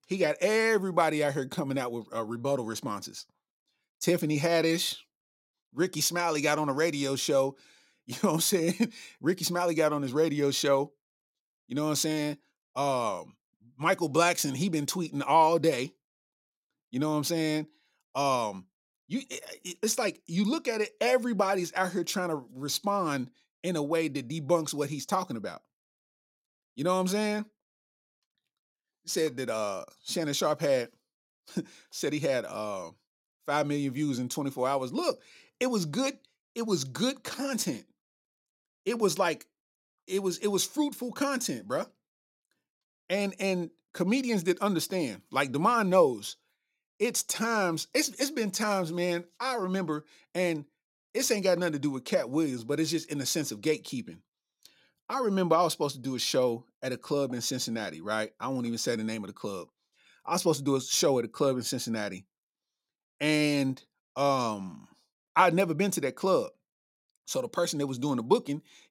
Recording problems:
none

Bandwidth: 16 kHz